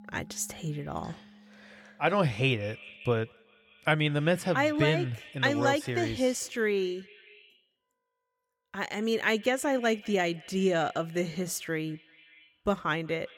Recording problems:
echo of what is said; faint; throughout; 190 ms later, 20 dB below the speech
background music; faint; throughout; 25 dB below the speech

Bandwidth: 17.5 kHz